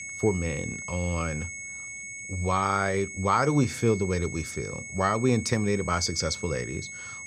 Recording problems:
high-pitched whine; loud; throughout; 2 kHz, 9 dB below the speech

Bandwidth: 14.5 kHz